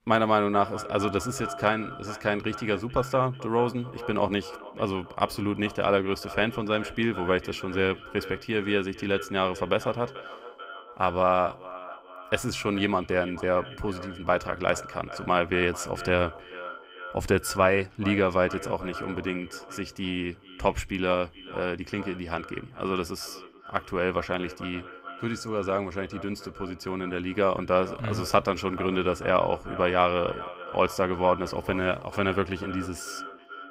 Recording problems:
echo of what is said; noticeable; throughout; 440 ms later, 15 dB below the speech

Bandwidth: 15.5 kHz